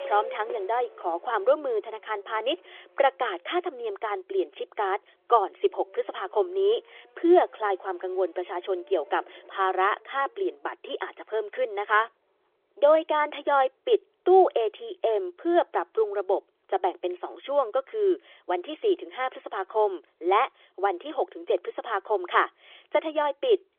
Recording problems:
phone-call audio; nothing above 3.5 kHz
traffic noise; faint; throughout; 20 dB below the speech

